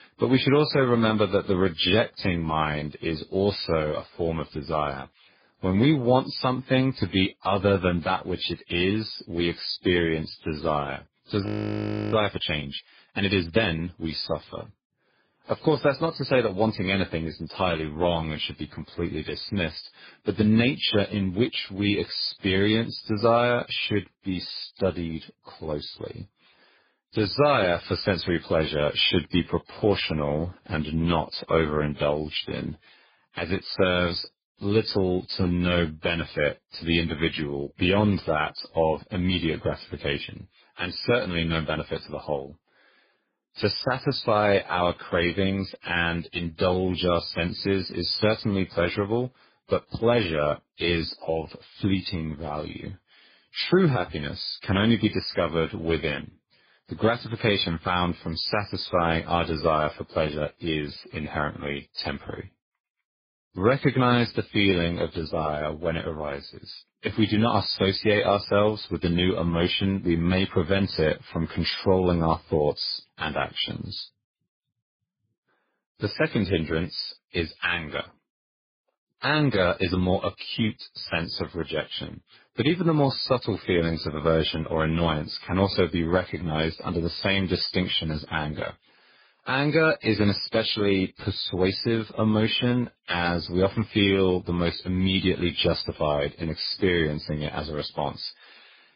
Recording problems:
garbled, watery; badly; nothing above 5 kHz
audio freezing; at 11 s for 0.5 s

